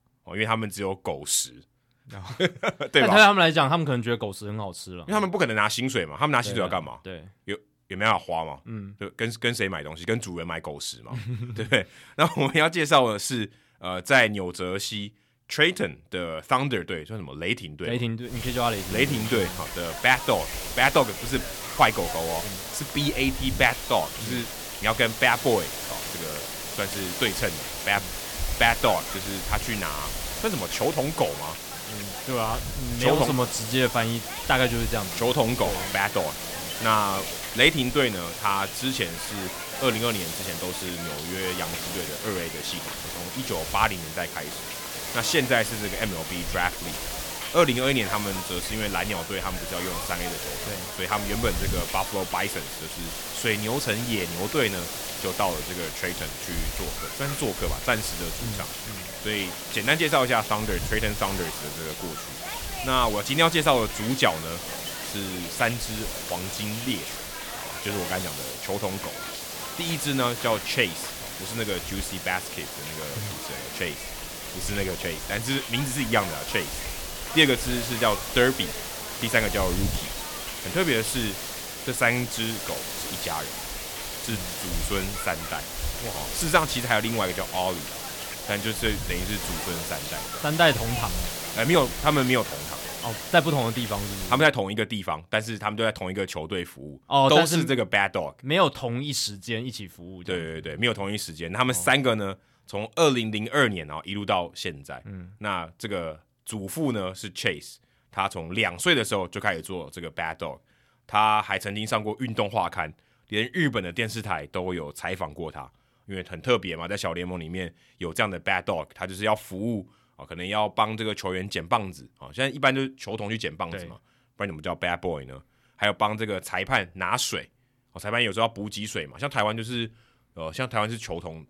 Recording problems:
hiss; loud; from 18 s to 1:34; 6 dB below the speech

